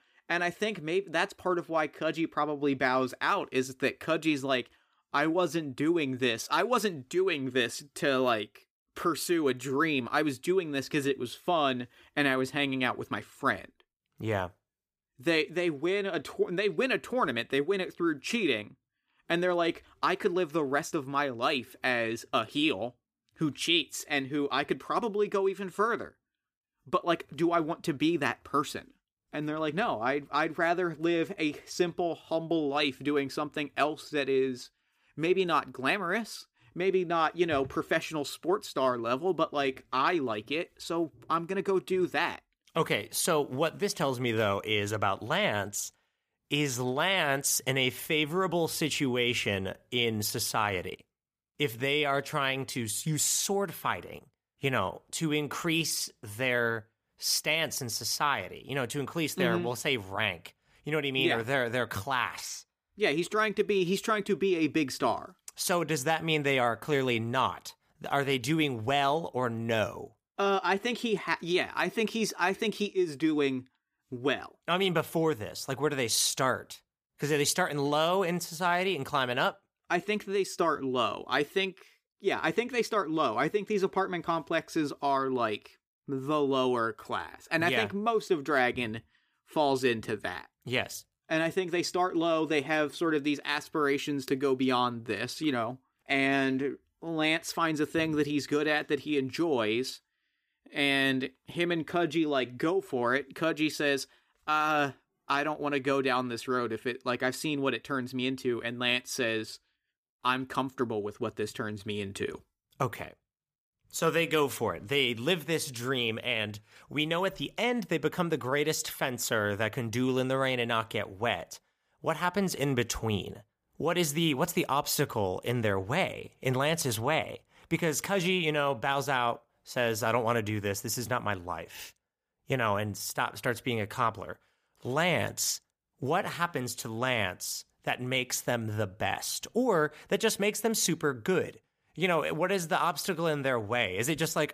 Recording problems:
none

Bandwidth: 15 kHz